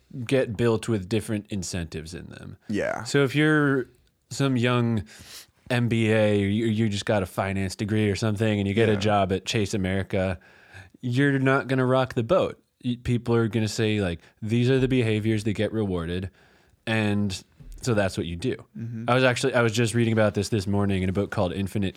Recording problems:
none

